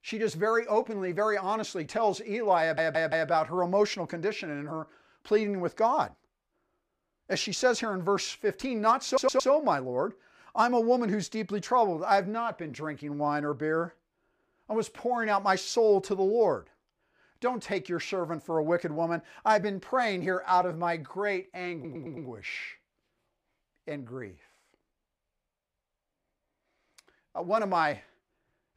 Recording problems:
audio stuttering; at 2.5 s, at 9 s and at 22 s

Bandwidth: 15 kHz